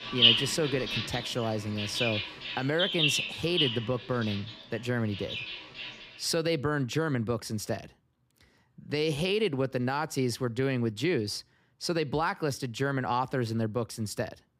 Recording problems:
animal sounds; very loud; until 6 s; 2 dB above the speech

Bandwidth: 15.5 kHz